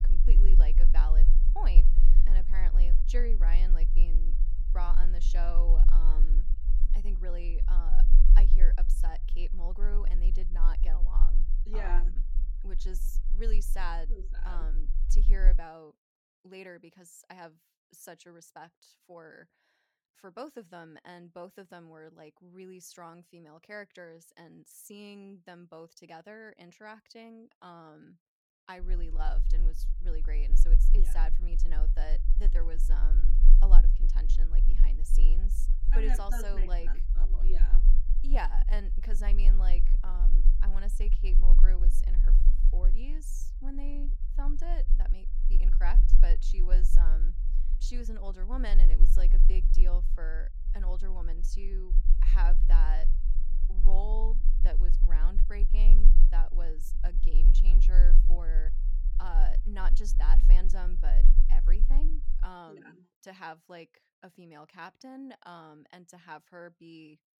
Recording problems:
low rumble; noticeable; until 16 s and from 29 s to 1:02; 10 dB below the speech

